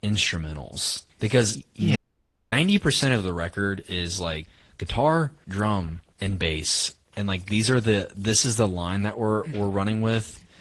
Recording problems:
garbled, watery; slightly
audio cutting out; at 2 s for 0.5 s

